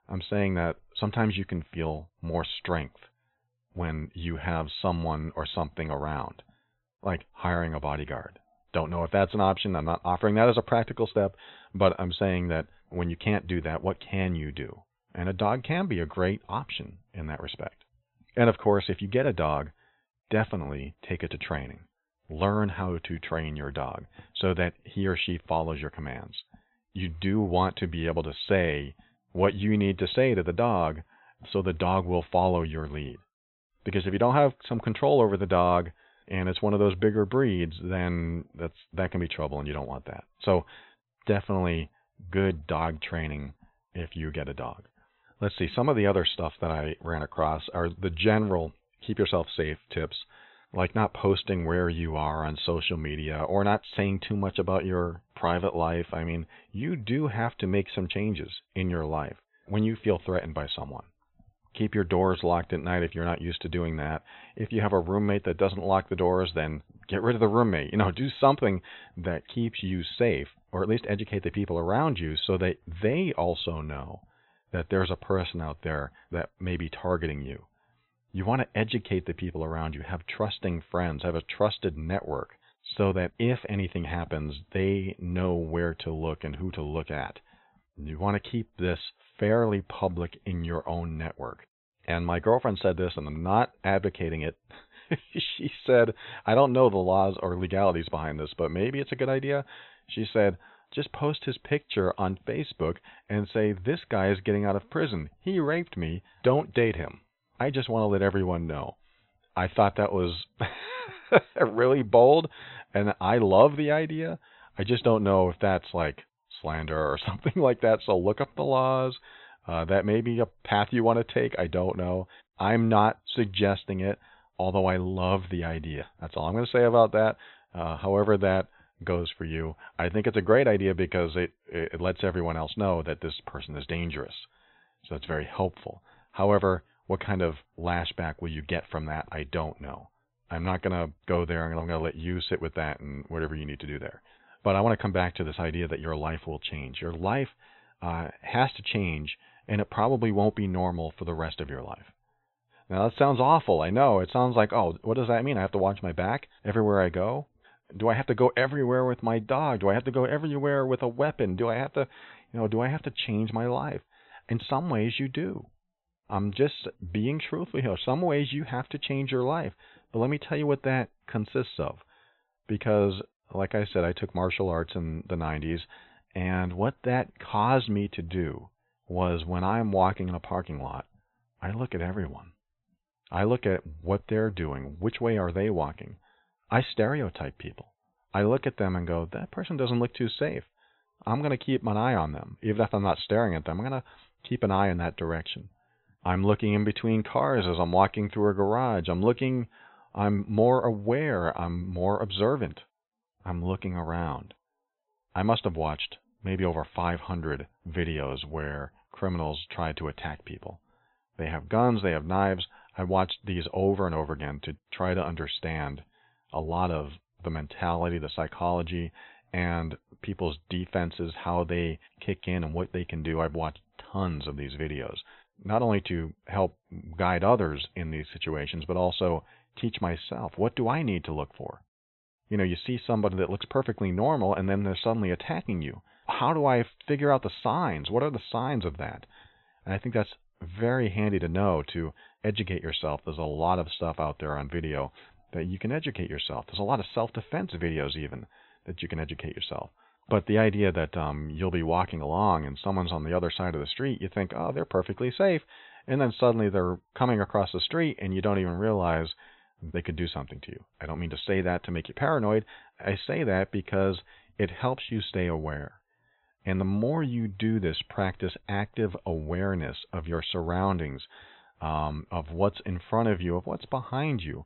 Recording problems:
high frequencies cut off; severe; nothing above 4 kHz

